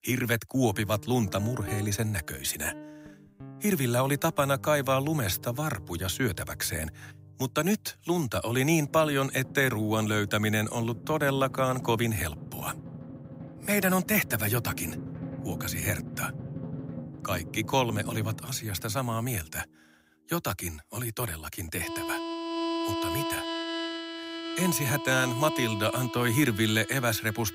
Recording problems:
background music; loud; throughout; 10 dB below the speech

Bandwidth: 15.5 kHz